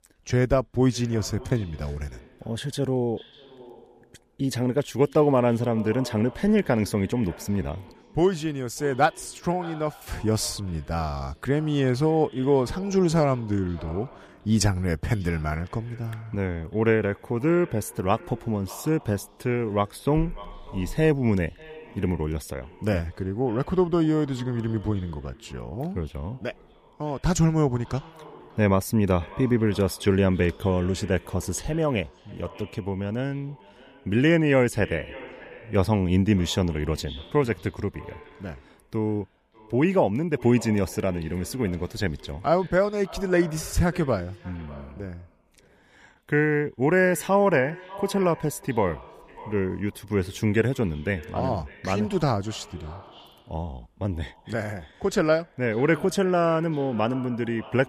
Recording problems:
echo of what is said; faint; throughout; 590 ms later, 20 dB below the speech

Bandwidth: 15 kHz